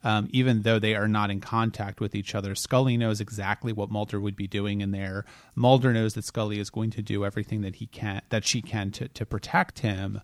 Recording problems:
none

